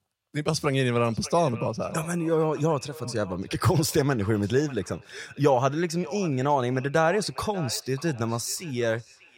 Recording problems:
echo of what is said; faint; throughout; 590 ms later, 20 dB below the speech

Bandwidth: 16.5 kHz